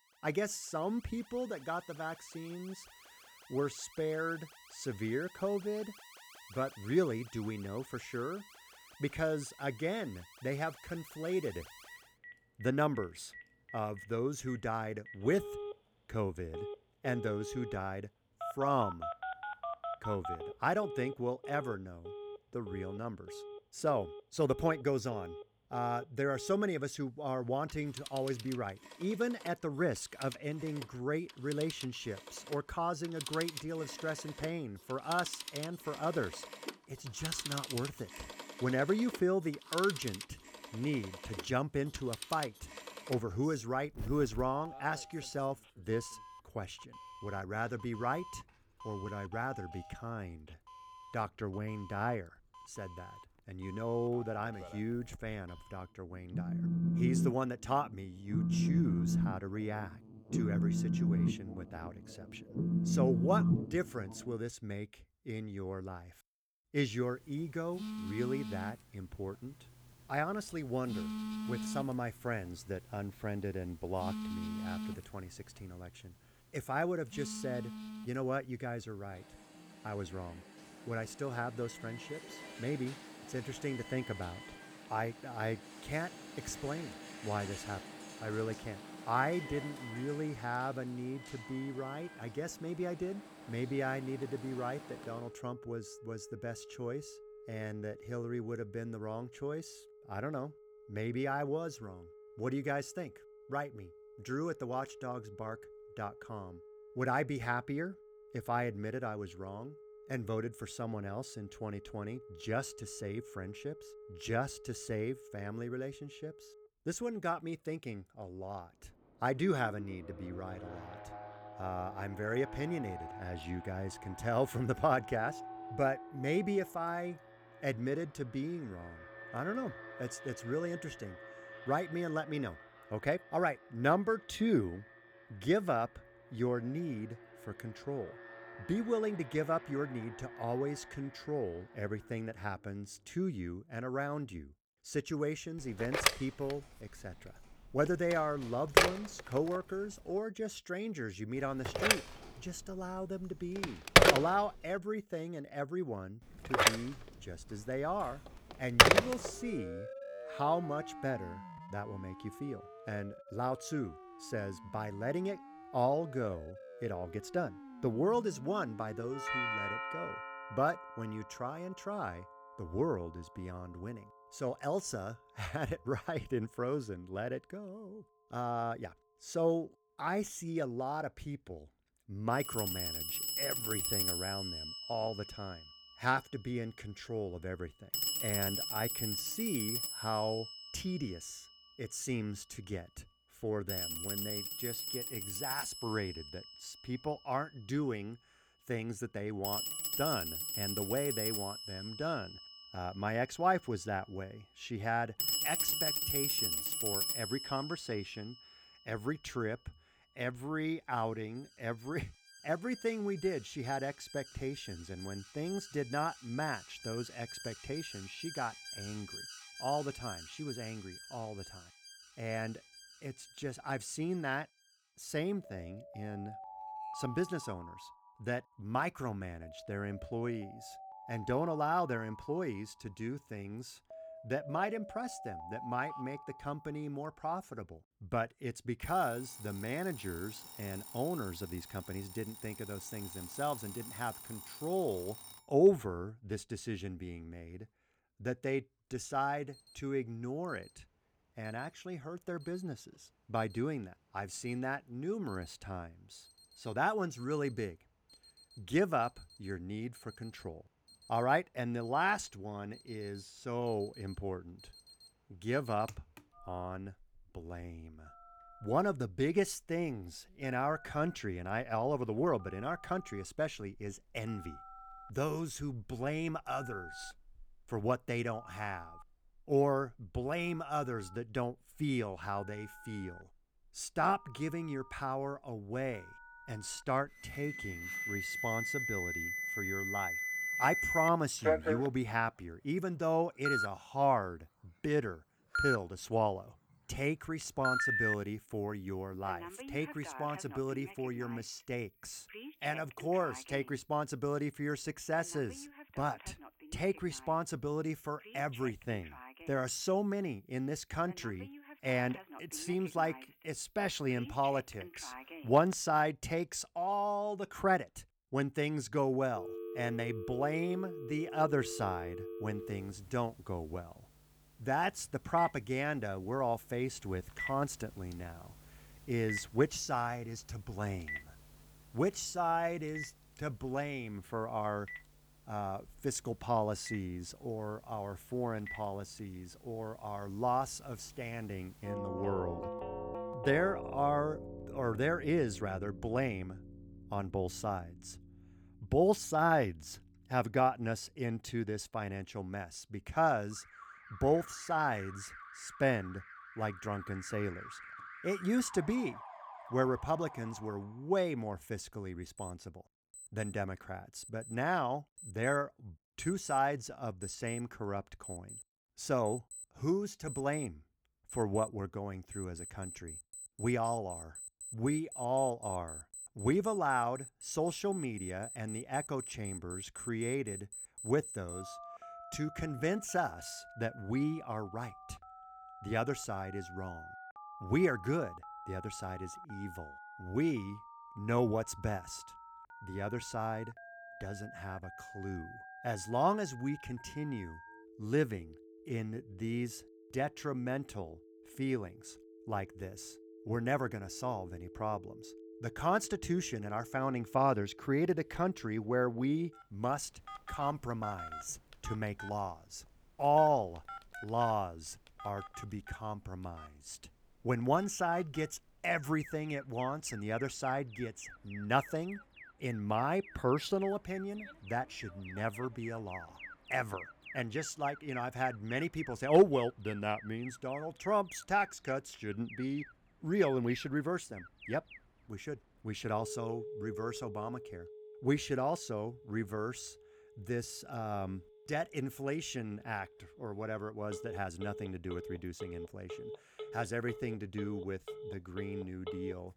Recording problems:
alarms or sirens; loud; throughout; 3 dB below the speech

